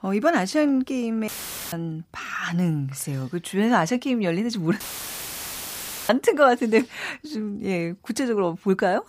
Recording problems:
audio cutting out; filled with static; at 1.5 s and at 5 s for 1.5 s

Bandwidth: 15 kHz